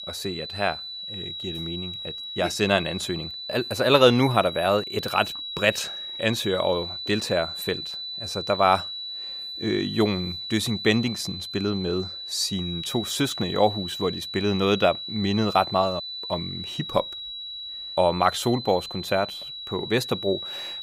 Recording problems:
high-pitched whine; loud; throughout; 4 kHz, 7 dB below the speech

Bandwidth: 15.5 kHz